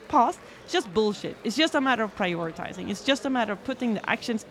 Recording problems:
murmuring crowd; noticeable; throughout; 20 dB below the speech

